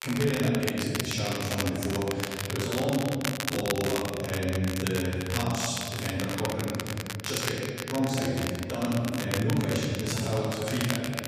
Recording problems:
room echo; strong; dies away in 2.4 s
off-mic speech; far
crackle, like an old record; very faint; 6 dB below the speech

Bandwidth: 14.5 kHz